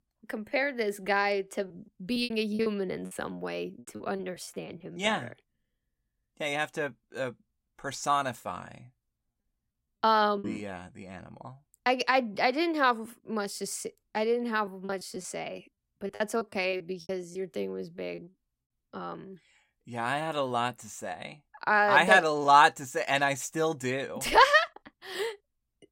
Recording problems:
choppy; very; from 1.5 to 5 s, at 10 s and from 15 to 18 s; 14% of the speech affected

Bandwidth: 16 kHz